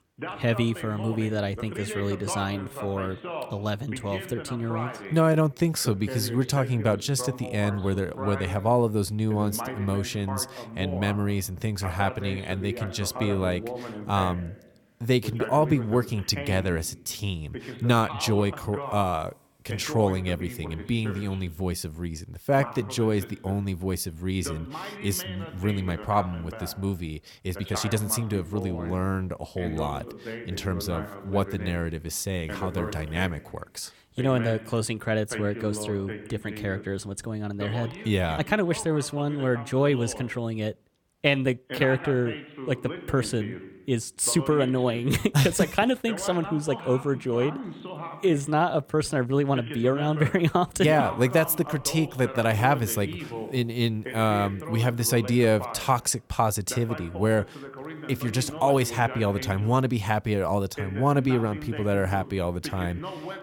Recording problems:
voice in the background; noticeable; throughout; 10 dB below the speech
uneven, jittery; strongly; from 2.5 to 49 s

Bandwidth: 18 kHz